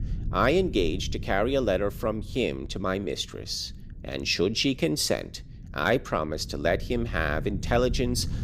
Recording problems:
low rumble; faint; throughout; 25 dB below the speech

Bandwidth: 15 kHz